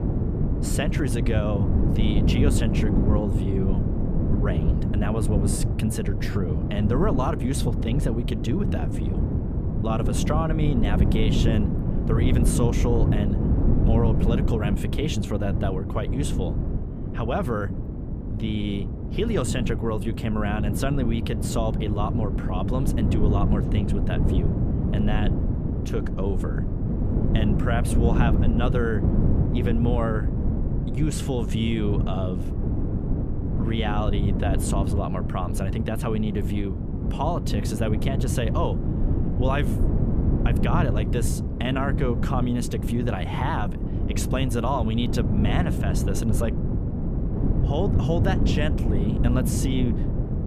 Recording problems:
wind noise on the microphone; heavy; 4 dB below the speech

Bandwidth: 14.5 kHz